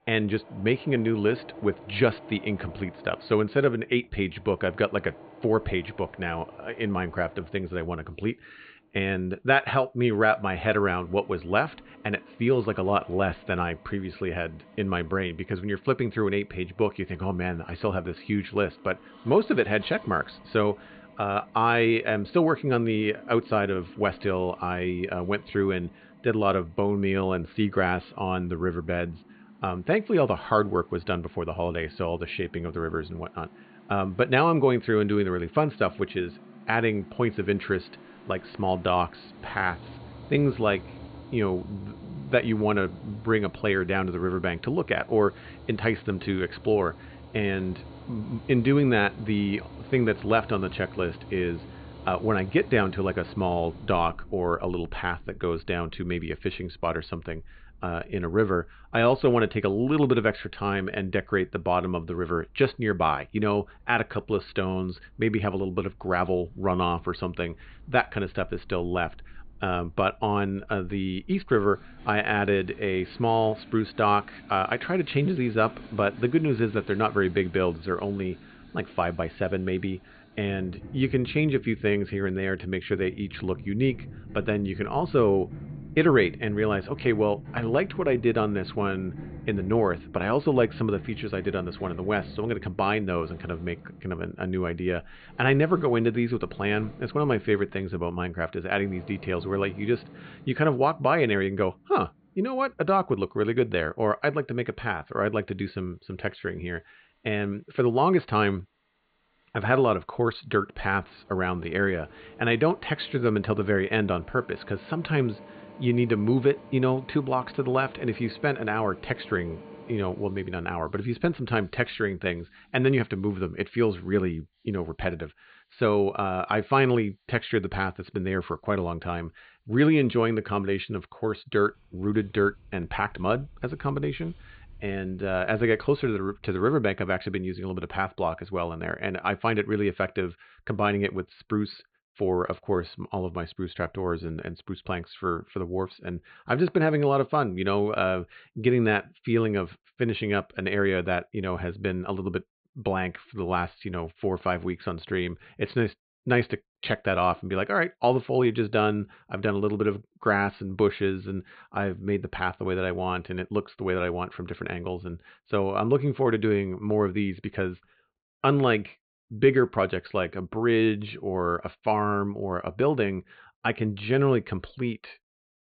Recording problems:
high frequencies cut off; severe; nothing above 4.5 kHz
machinery noise; faint; until 2:16; 20 dB below the speech

